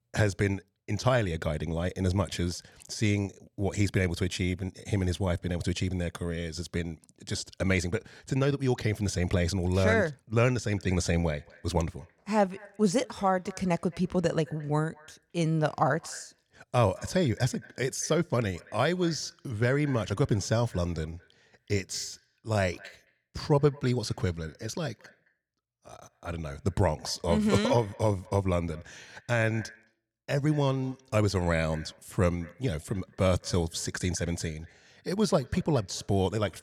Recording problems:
echo of what is said; faint; from 11 s on; 220 ms later, 25 dB below the speech

